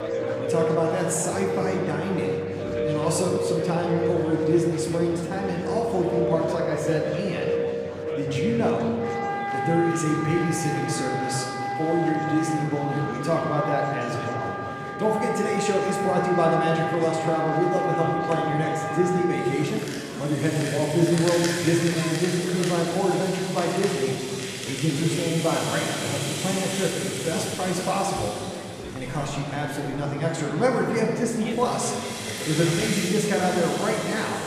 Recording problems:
room echo; noticeable; dies away in 1.8 s
off-mic speech; somewhat distant
background music; loud; throughout; 4 dB below the speech
murmuring crowd; noticeable; throughout; 10 dB below the speech

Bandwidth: 14.5 kHz